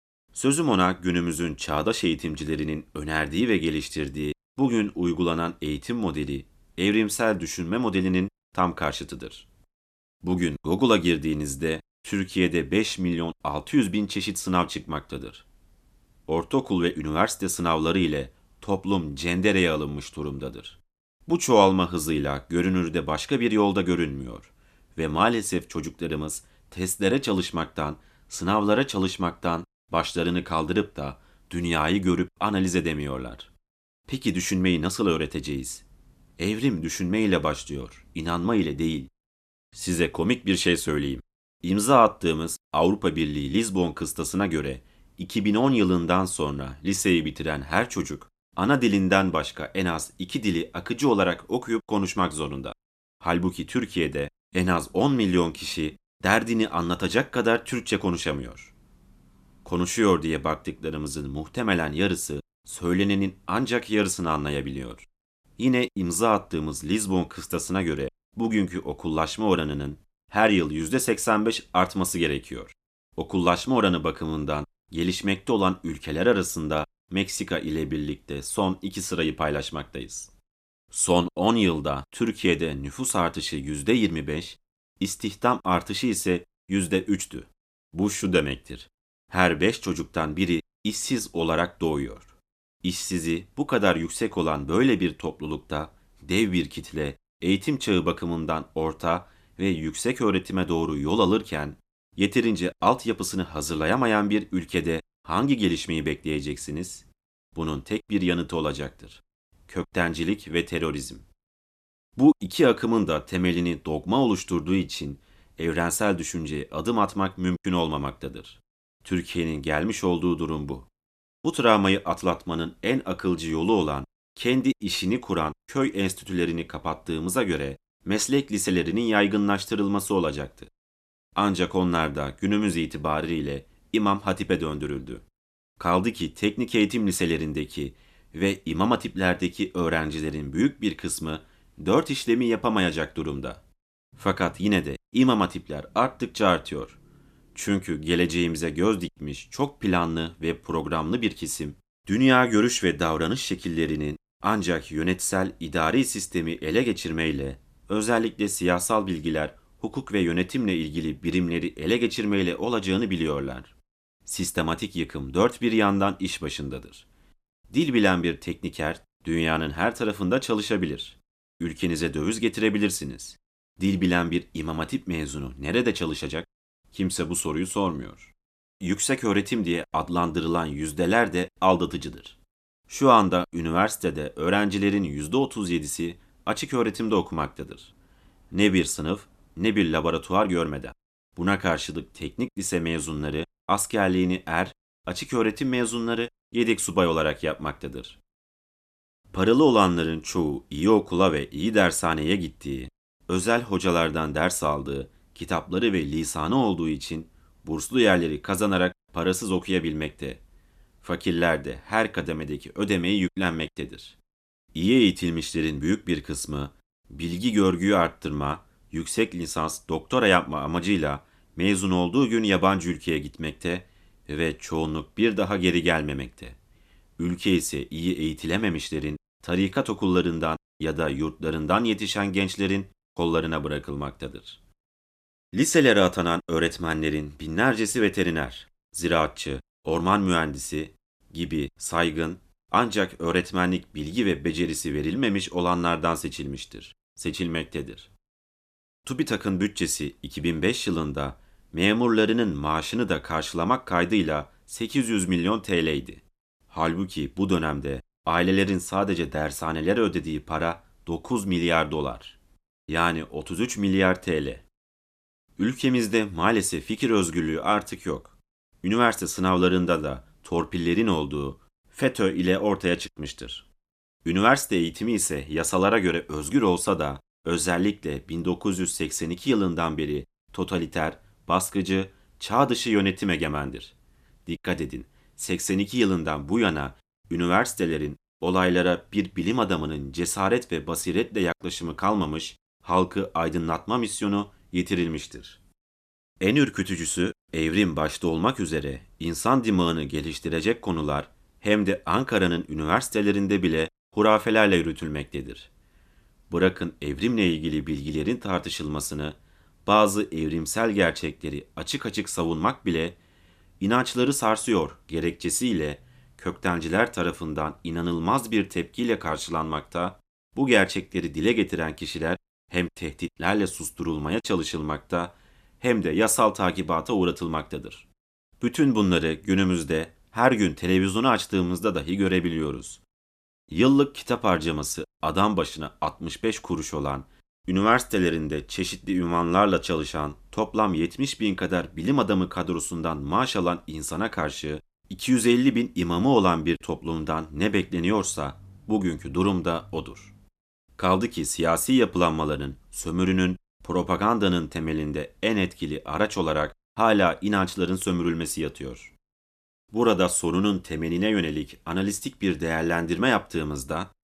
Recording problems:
none

